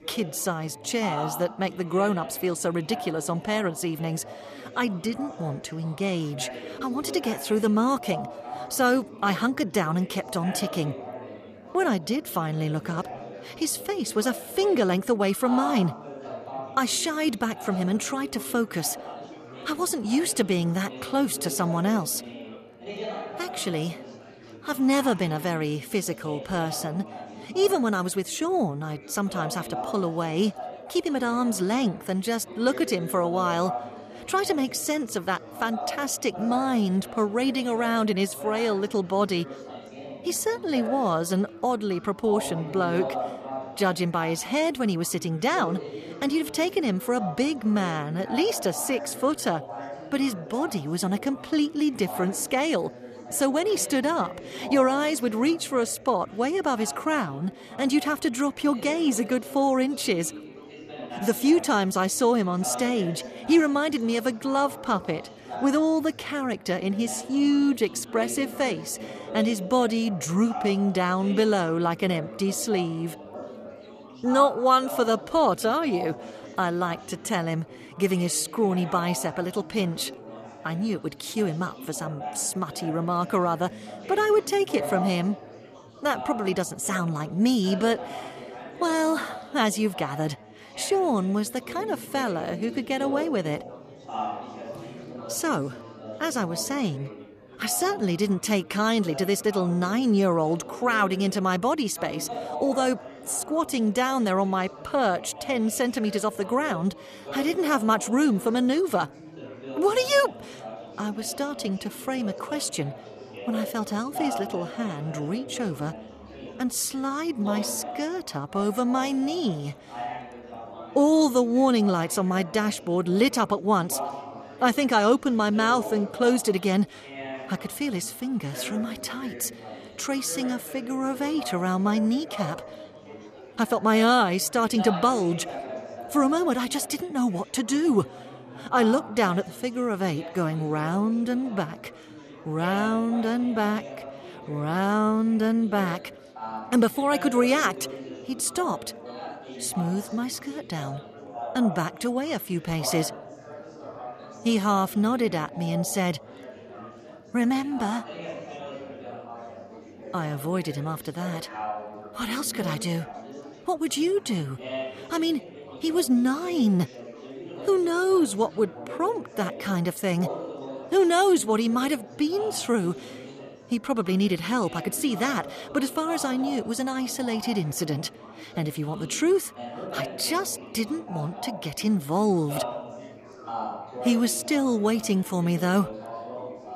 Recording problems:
chatter from many people; noticeable; throughout; 15 dB below the speech

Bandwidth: 14.5 kHz